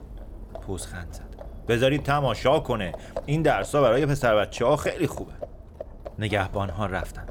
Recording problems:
animal sounds; noticeable; throughout; 15 dB below the speech

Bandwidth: 17.5 kHz